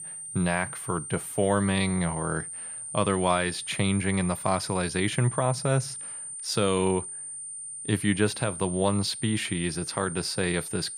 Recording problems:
high-pitched whine; loud; throughout; 9 kHz, 8 dB below the speech

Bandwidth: 15.5 kHz